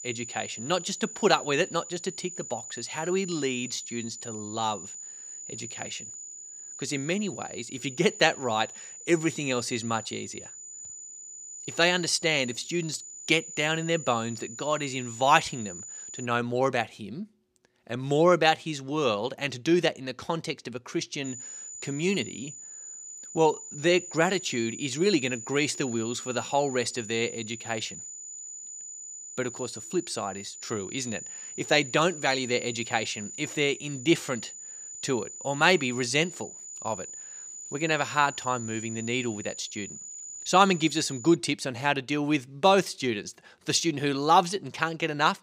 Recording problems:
high-pitched whine; noticeable; until 16 s and from 21 to 41 s; 7 kHz, 10 dB below the speech

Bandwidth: 15.5 kHz